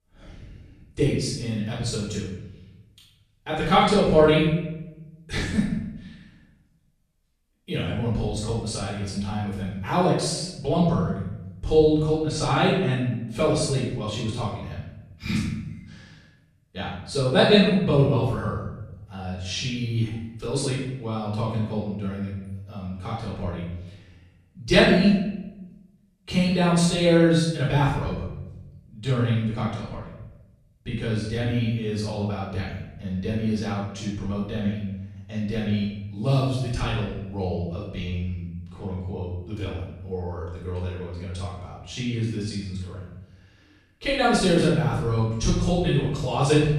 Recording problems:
off-mic speech; far
room echo; noticeable; dies away in 0.9 s

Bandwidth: 14 kHz